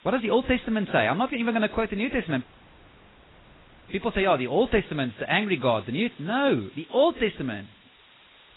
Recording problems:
garbled, watery; badly; nothing above 4 kHz
hiss; faint; throughout; 25 dB below the speech
audio cutting out; at 2.5 s for 1.5 s

